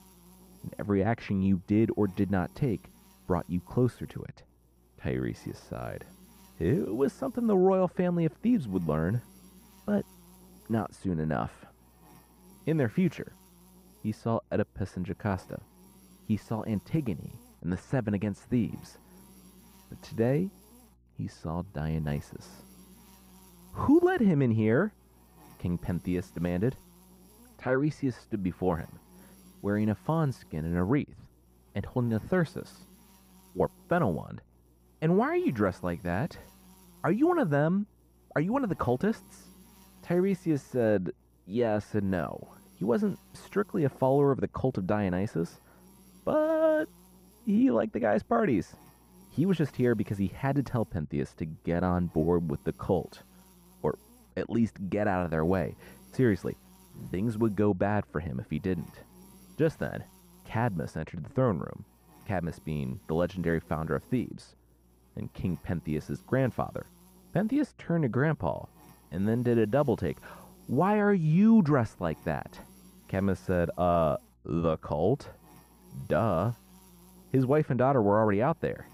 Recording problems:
muffled; very; fading above 3 kHz
electrical hum; faint; throughout; 60 Hz, 30 dB below the speech

